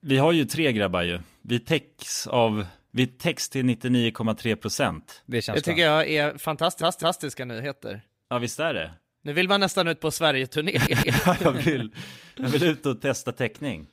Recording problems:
audio stuttering; at 6.5 s and at 11 s

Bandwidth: 15.5 kHz